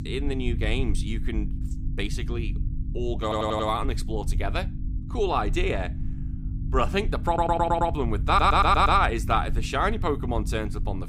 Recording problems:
electrical hum; faint; throughout; 50 Hz, 25 dB below the speech
low rumble; faint; throughout; 25 dB below the speech
audio stuttering; at 3 s, at 7.5 s and at 8.5 s

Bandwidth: 15.5 kHz